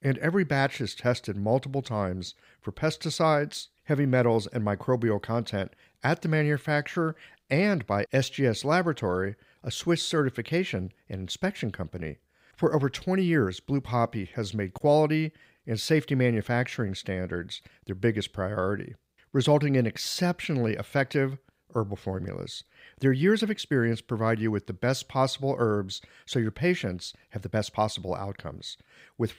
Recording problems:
uneven, jittery; slightly; from 17 to 28 s

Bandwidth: 15.5 kHz